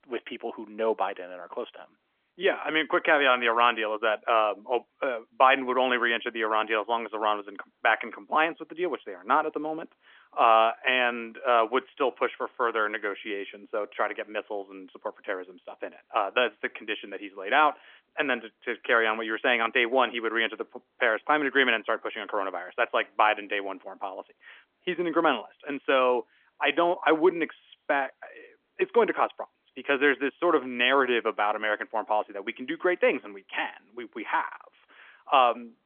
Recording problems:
phone-call audio; nothing above 3.5 kHz

